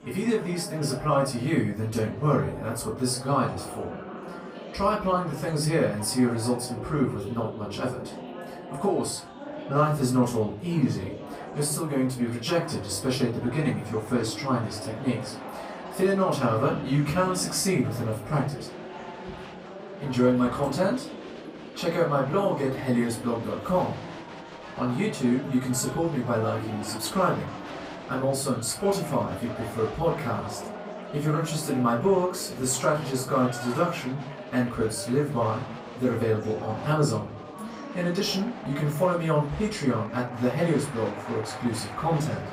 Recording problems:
off-mic speech; far
room echo; slight; dies away in 0.3 s
murmuring crowd; noticeable; throughout; 10 dB below the speech

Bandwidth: 15.5 kHz